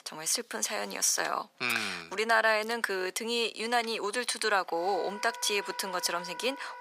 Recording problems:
thin; very; fading below 750 Hz
background music; noticeable; throughout; 15 dB below the speech

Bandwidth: 15 kHz